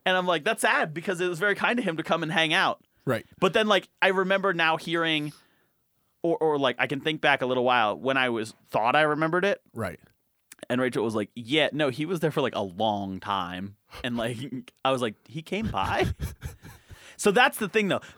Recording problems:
none

